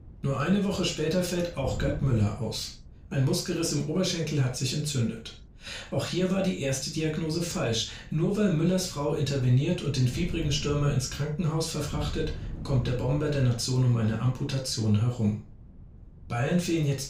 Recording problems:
off-mic speech; far
room echo; noticeable; dies away in 0.3 s
wind noise on the microphone; occasional gusts; 25 dB below the speech

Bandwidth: 15.5 kHz